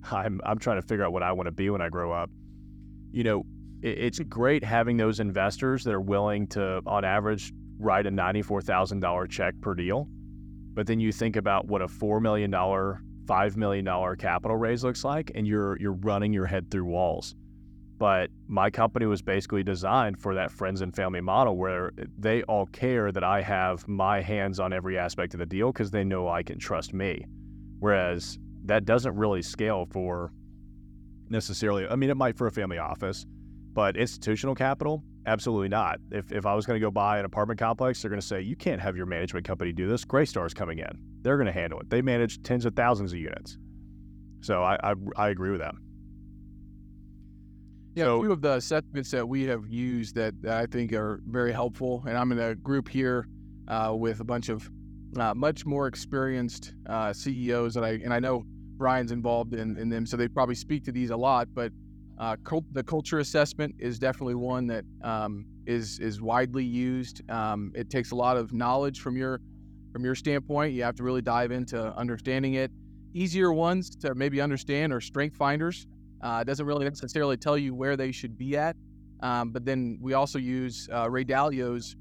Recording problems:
electrical hum; faint; throughout; 50 Hz, 30 dB below the speech

